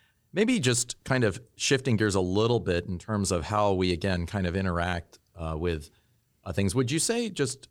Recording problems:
none

